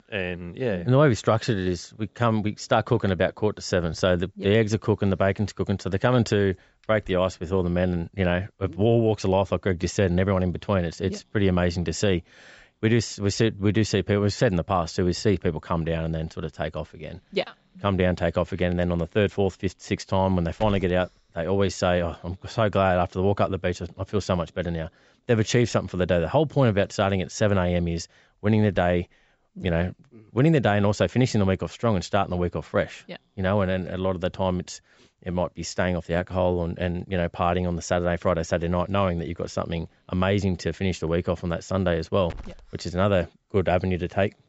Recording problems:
high frequencies cut off; noticeable; nothing above 7.5 kHz
hiss; faint; throughout; 30 dB below the speech

